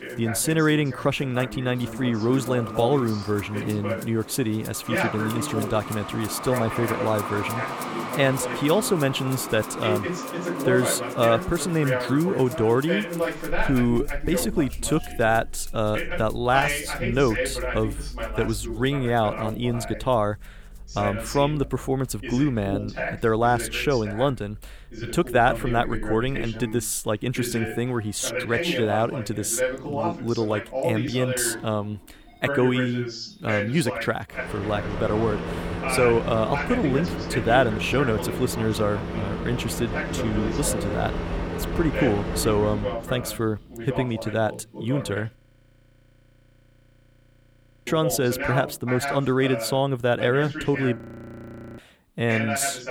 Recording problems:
traffic noise; loud; throughout; 9 dB below the speech
voice in the background; loud; throughout; 7 dB below the speech
background music; faint; throughout; 20 dB below the speech
audio freezing; at 45 s for 2.5 s and at 51 s for 1 s

